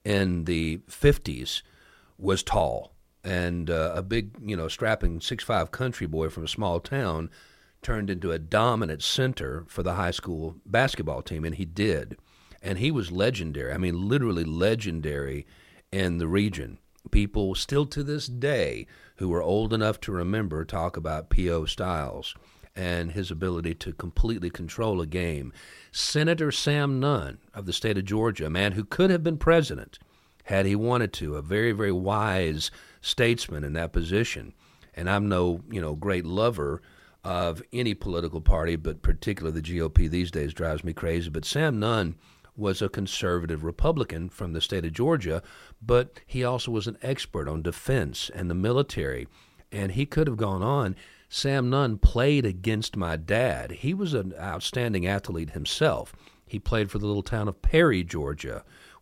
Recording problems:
none

